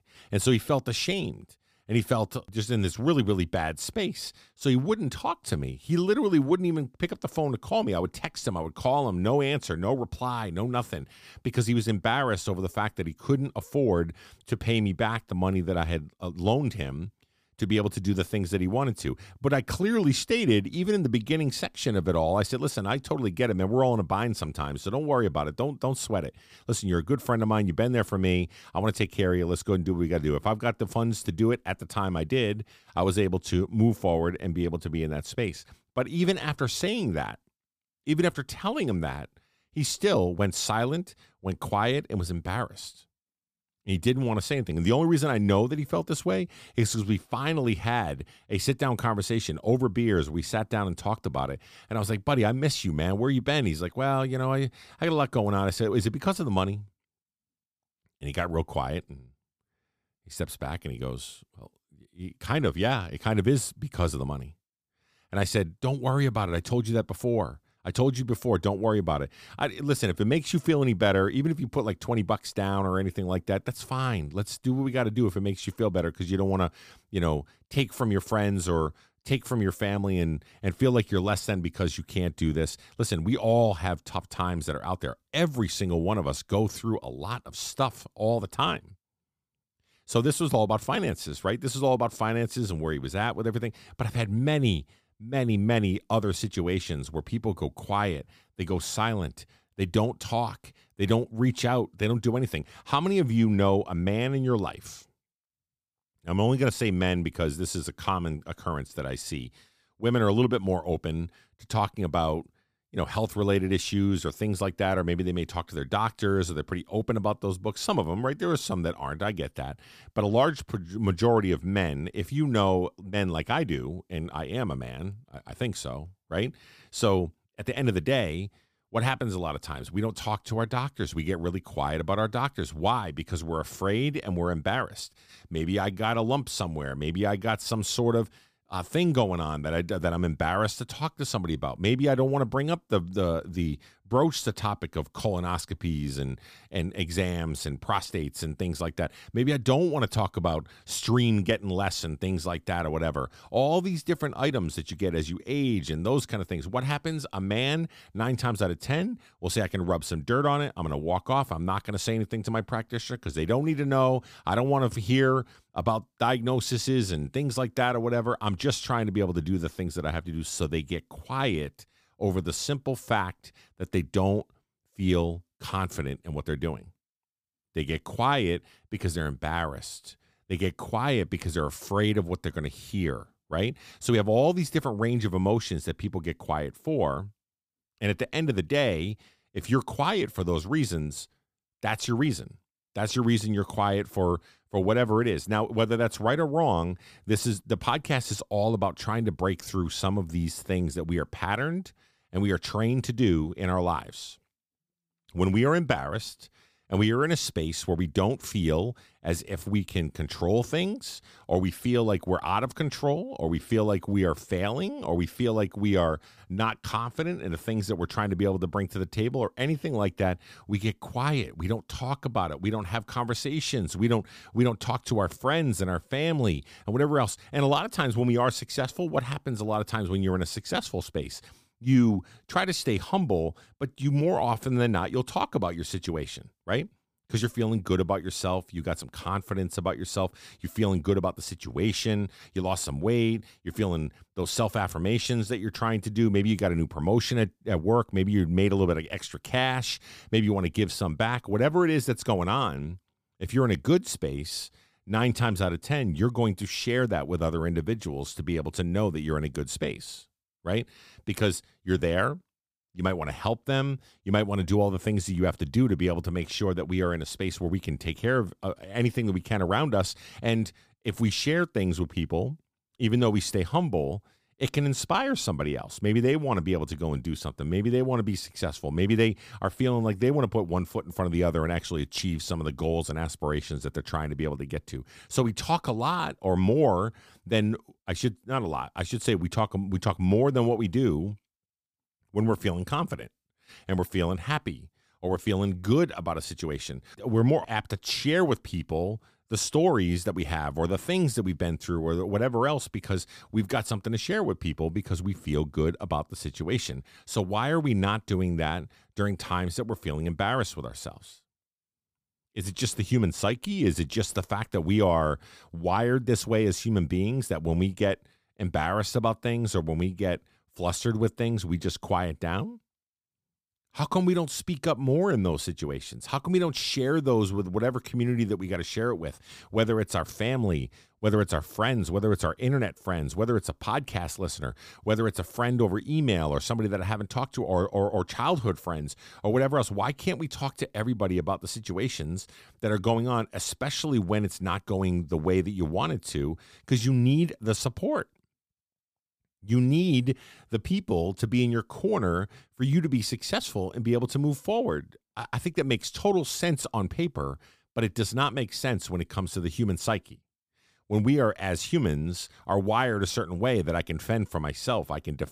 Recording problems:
none

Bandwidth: 15 kHz